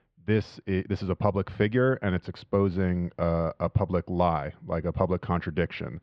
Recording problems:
muffled; very; fading above 3 kHz

